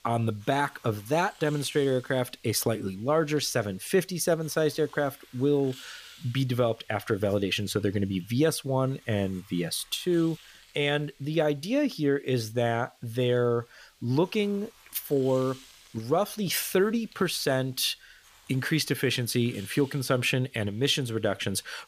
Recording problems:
hiss; faint; throughout; 25 dB below the speech

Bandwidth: 15 kHz